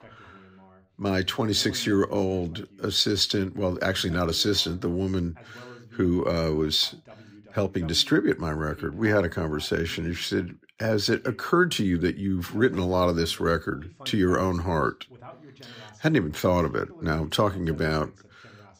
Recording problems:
voice in the background; faint; throughout; 25 dB below the speech

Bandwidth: 15.5 kHz